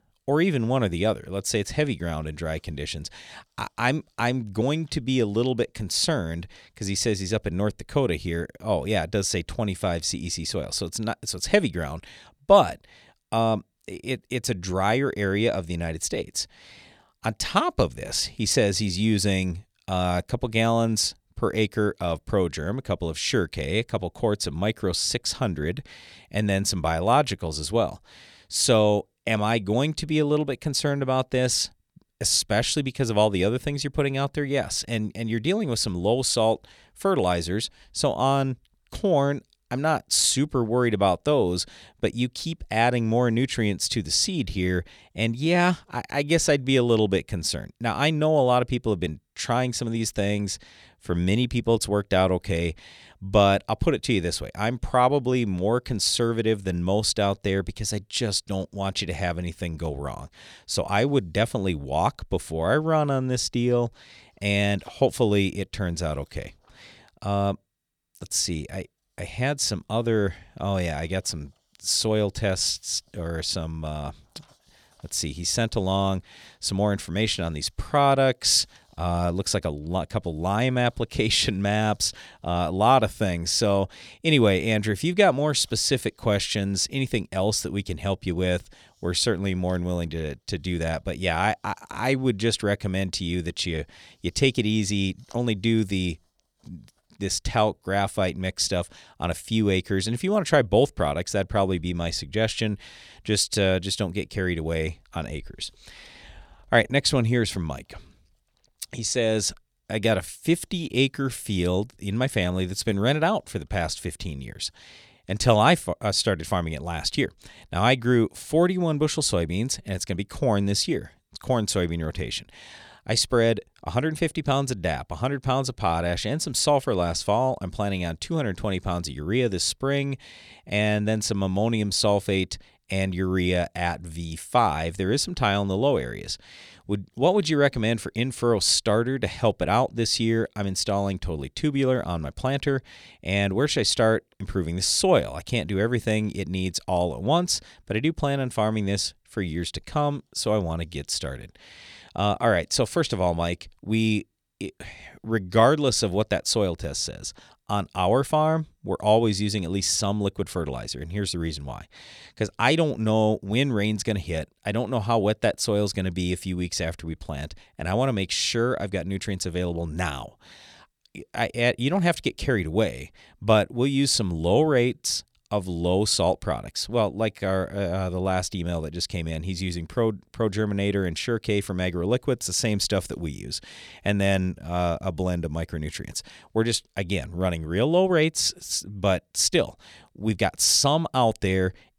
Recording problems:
none

